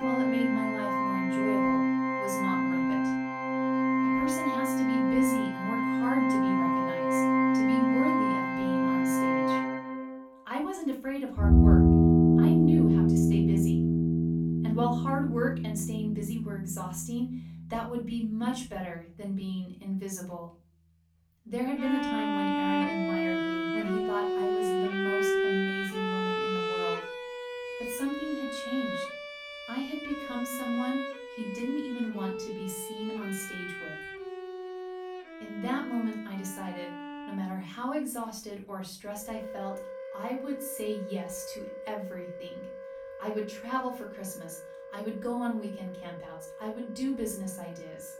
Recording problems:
off-mic speech; far
room echo; slight; dies away in 0.4 s
background music; very loud; throughout; 8 dB above the speech

